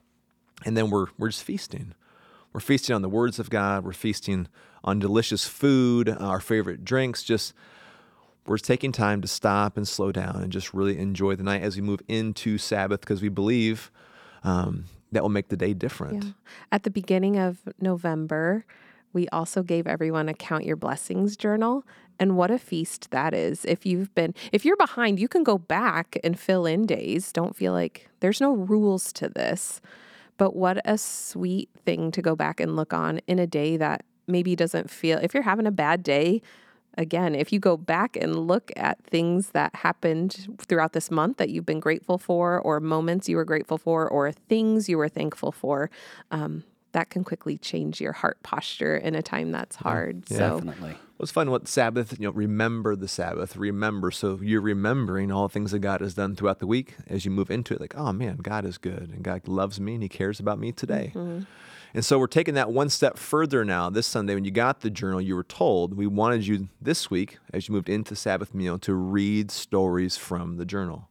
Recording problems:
none

